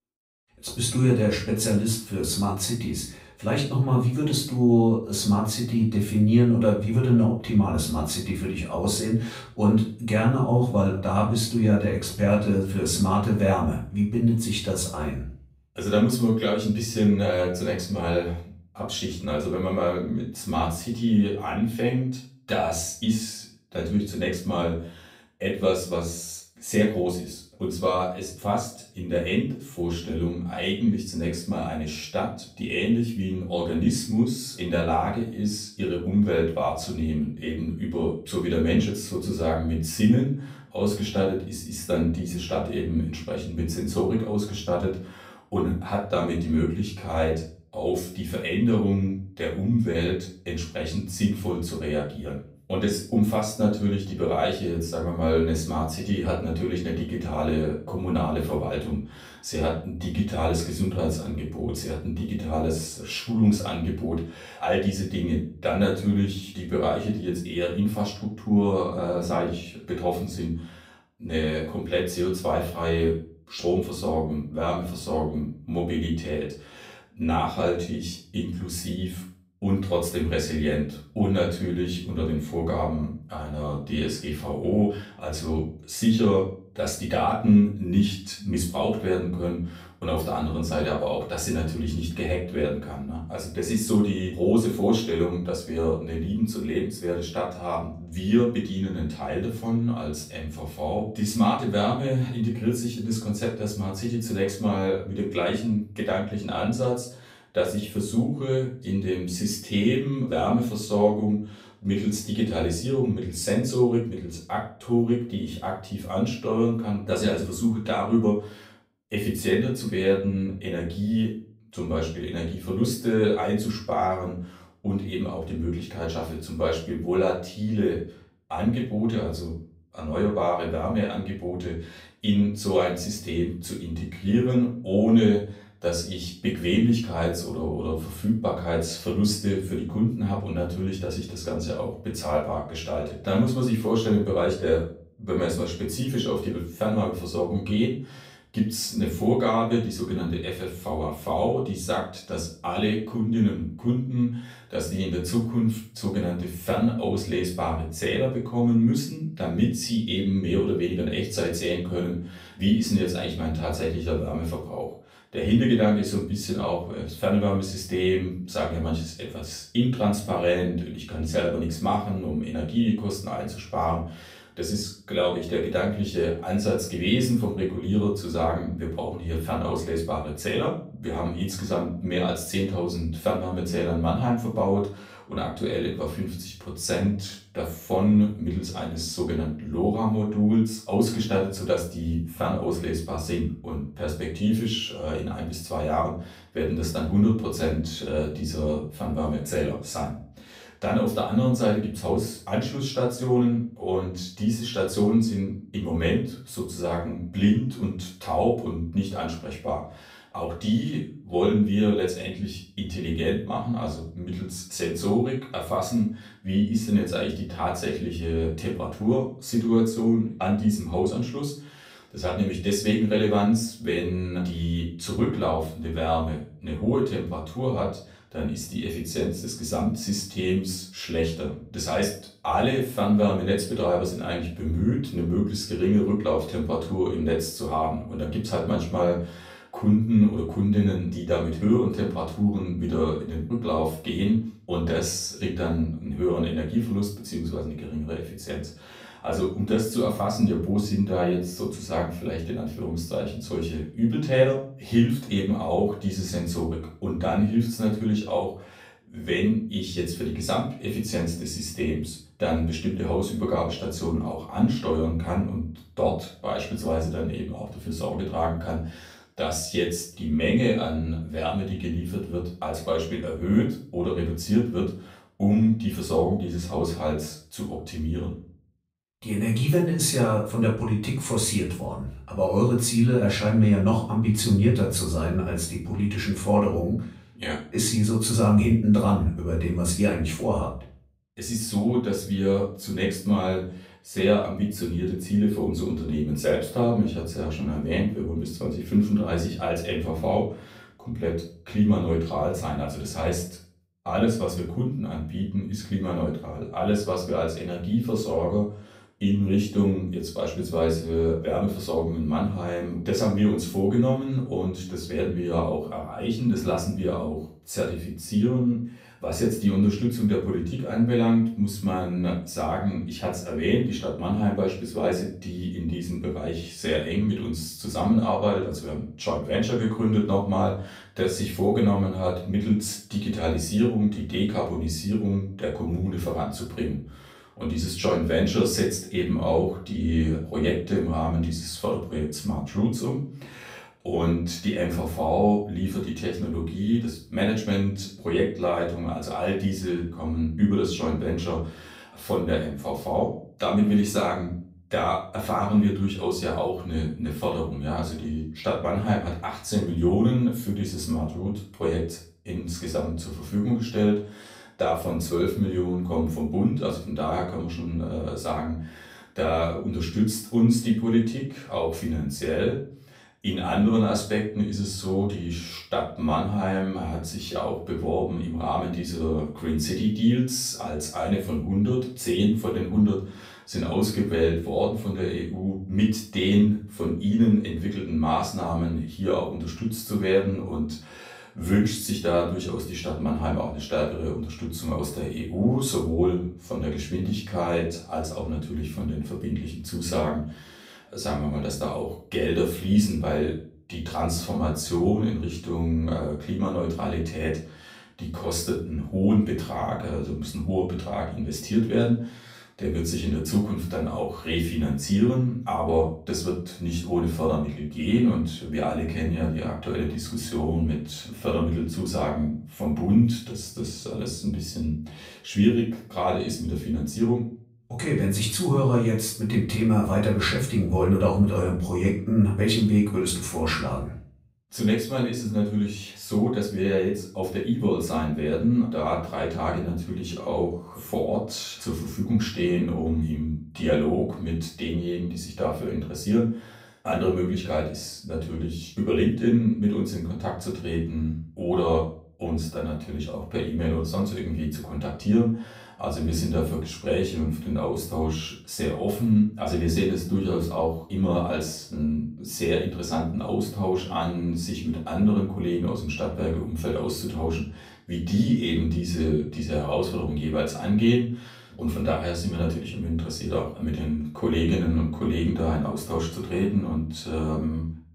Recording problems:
off-mic speech; far
room echo; slight; dies away in 0.4 s

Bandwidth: 15.5 kHz